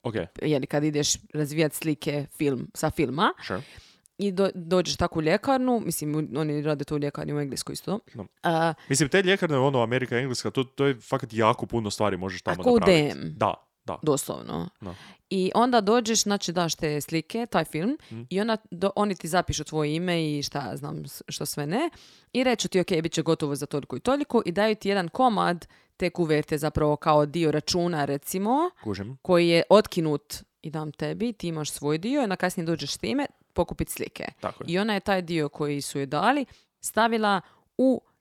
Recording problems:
none

